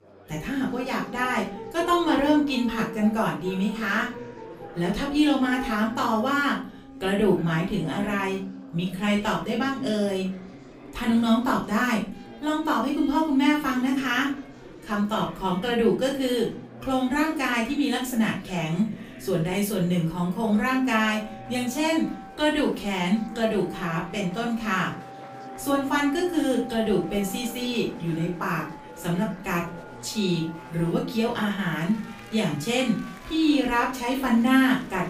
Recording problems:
off-mic speech; far
room echo; slight; dies away in 0.3 s
background music; noticeable; throughout; 20 dB below the speech
chatter from many people; noticeable; throughout; 20 dB below the speech

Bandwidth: 15 kHz